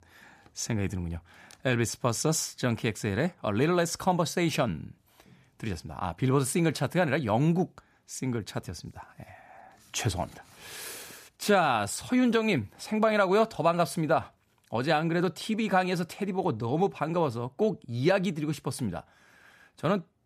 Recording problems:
none

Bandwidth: 14.5 kHz